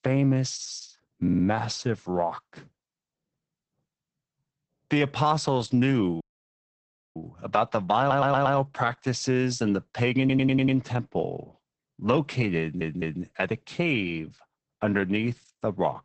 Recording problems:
garbled, watery; badly; nothing above 8 kHz
audio stuttering; 4 times, first at 1 s
audio cutting out; at 6 s for 1 s

